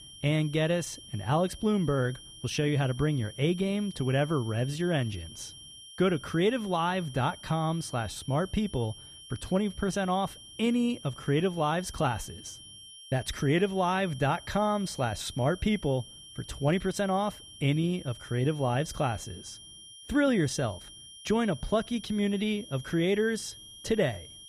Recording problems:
high-pitched whine; noticeable; throughout; 3 kHz, 15 dB below the speech

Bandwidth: 14.5 kHz